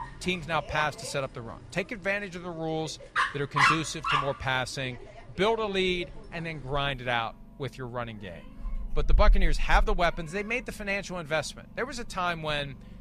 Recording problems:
animal sounds; very loud; throughout; 1 dB above the speech

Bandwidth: 14.5 kHz